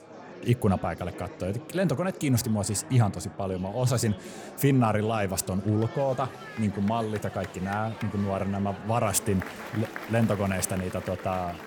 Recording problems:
murmuring crowd; noticeable; throughout; 15 dB below the speech

